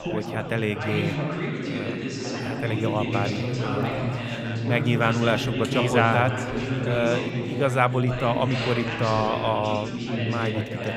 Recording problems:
chatter from many people; loud; throughout; 2 dB below the speech

